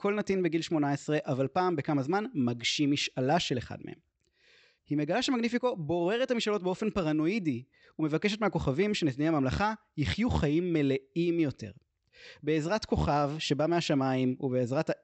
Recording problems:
high frequencies cut off; noticeable; nothing above 8 kHz

